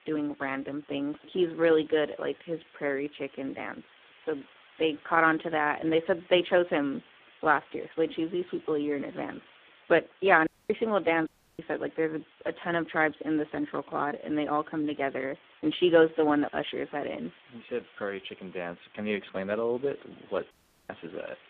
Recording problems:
phone-call audio; poor line
hiss; faint; throughout; 25 dB below the speech
audio cutting out; at 10 s, at 11 s and at 21 s

